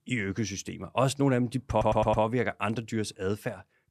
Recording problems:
audio stuttering; at 1.5 s

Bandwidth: 13.5 kHz